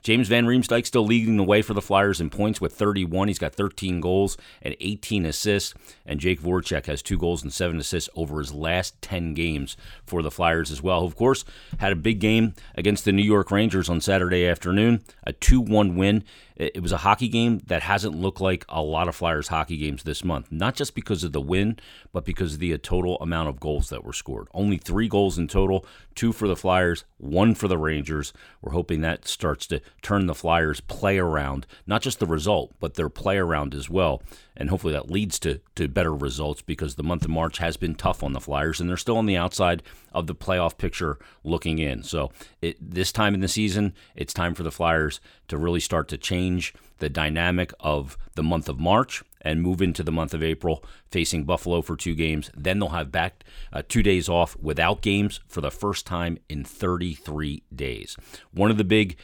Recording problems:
none

